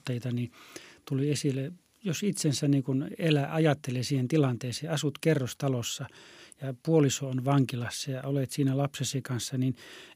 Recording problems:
none

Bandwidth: 15 kHz